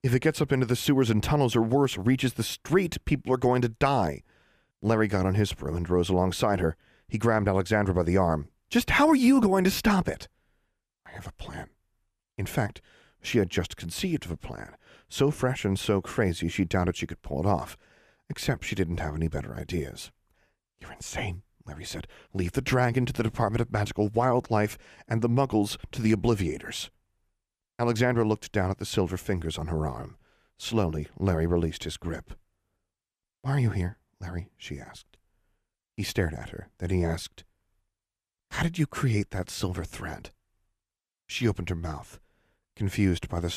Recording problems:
abrupt cut into speech; at the end

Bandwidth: 14.5 kHz